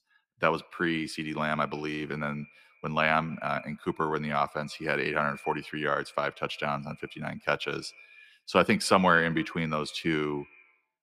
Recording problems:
echo of what is said; faint; throughout; 140 ms later, 25 dB below the speech

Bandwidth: 15 kHz